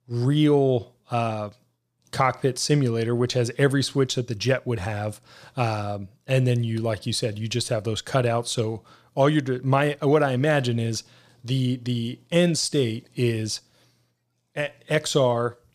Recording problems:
none

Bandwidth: 15 kHz